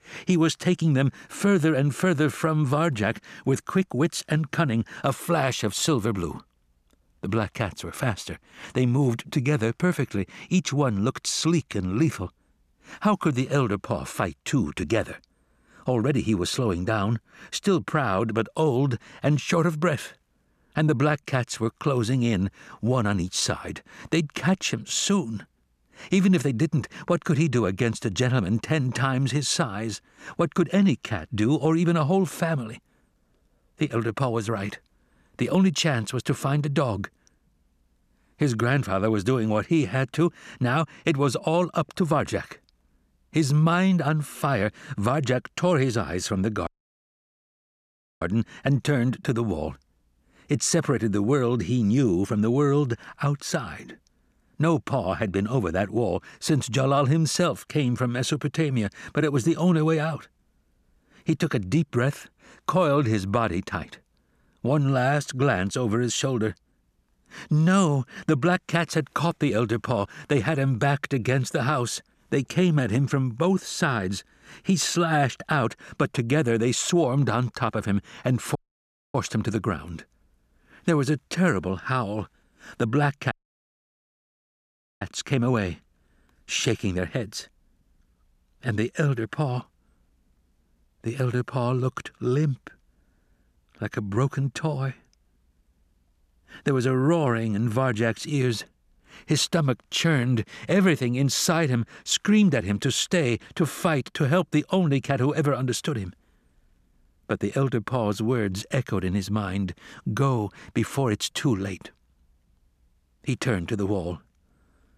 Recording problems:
audio cutting out; at 47 s for 1.5 s, at 1:19 for 0.5 s and at 1:23 for 1.5 s

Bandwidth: 14.5 kHz